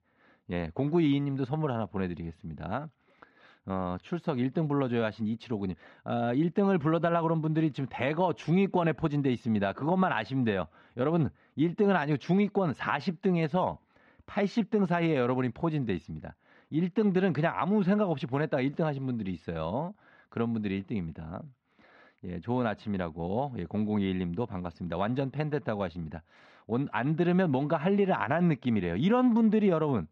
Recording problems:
muffled; slightly; fading above 3.5 kHz

